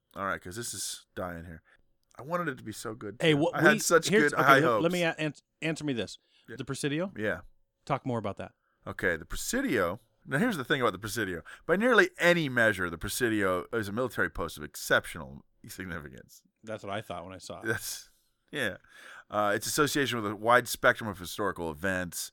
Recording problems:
none

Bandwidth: 18.5 kHz